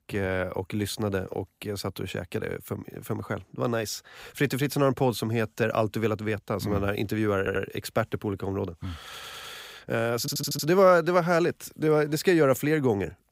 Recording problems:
audio stuttering; at 7.5 s, at 9 s and at 10 s

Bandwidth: 15.5 kHz